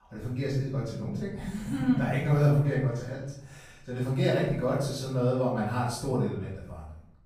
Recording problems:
off-mic speech; far
room echo; noticeable; dies away in 0.6 s

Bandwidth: 15.5 kHz